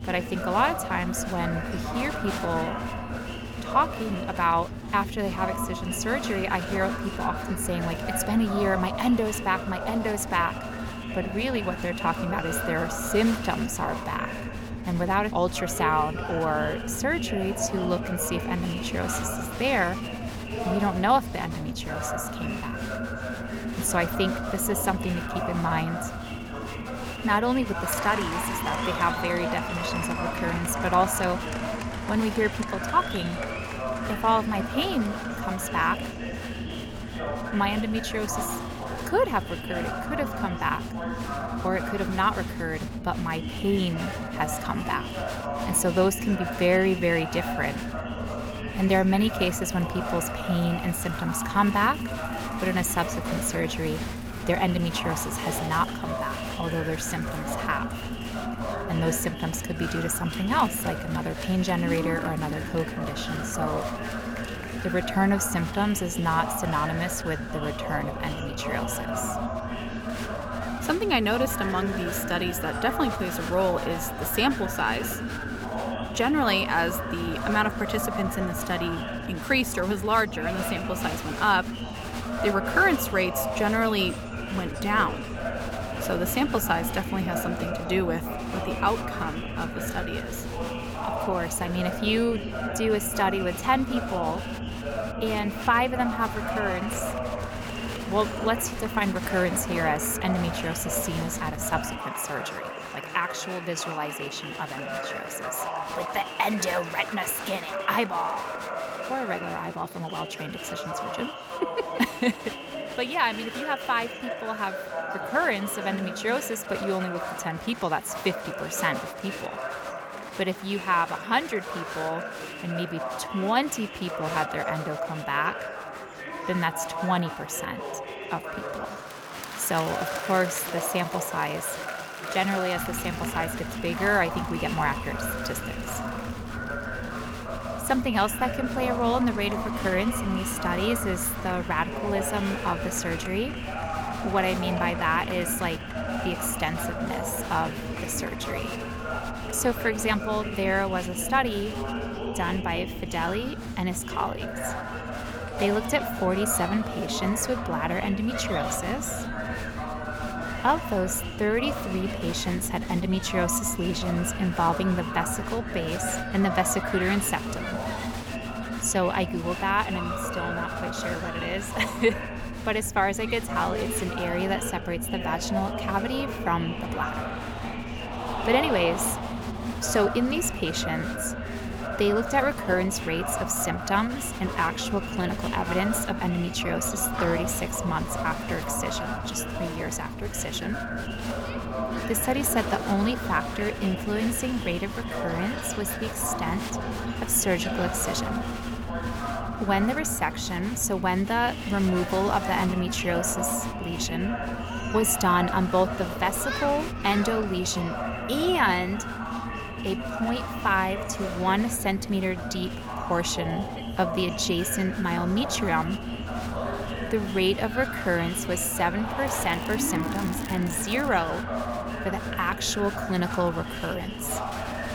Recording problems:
murmuring crowd; loud; throughout; 6 dB below the speech
low rumble; noticeable; until 1:42 and from 2:13 on; 15 dB below the speech
crackling; noticeable; from 3:39 to 3:41; 15 dB below the speech

